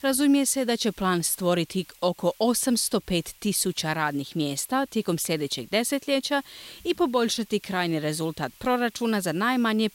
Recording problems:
hiss; faint; throughout; 25 dB below the speech

